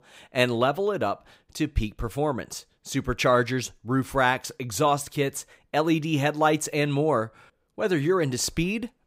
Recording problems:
none

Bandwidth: 15.5 kHz